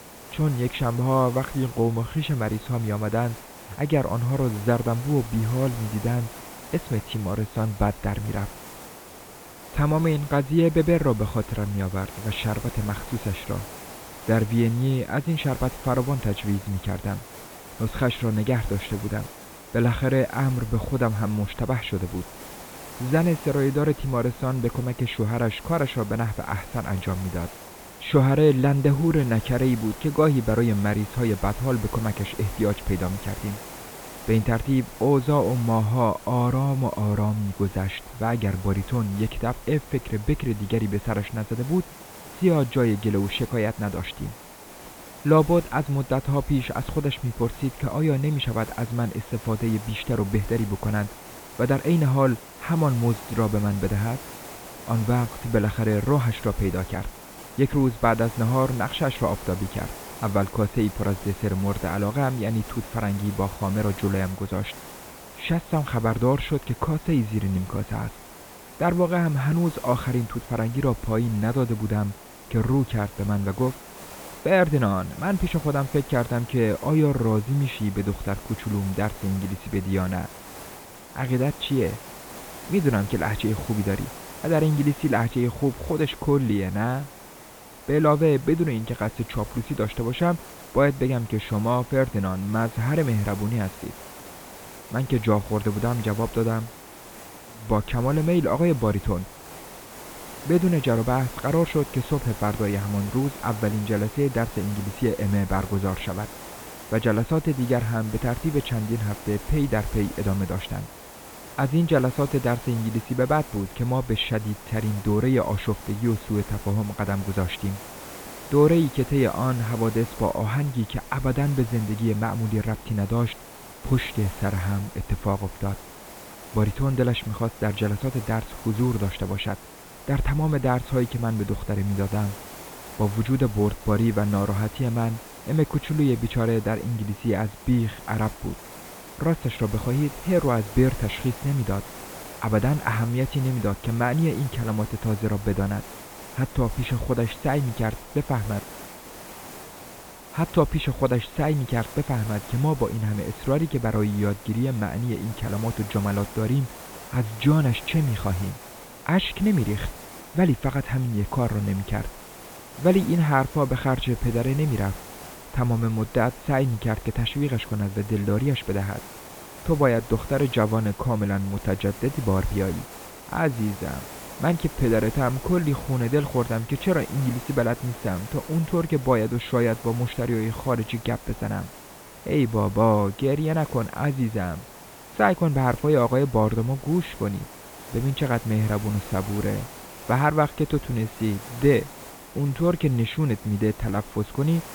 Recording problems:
high frequencies cut off; severe; nothing above 4 kHz
hiss; noticeable; throughout; 15 dB below the speech

